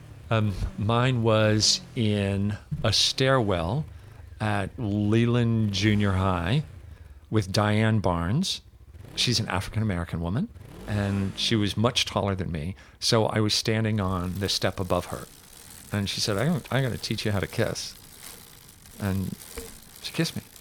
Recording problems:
traffic noise; faint; throughout; 20 dB below the speech

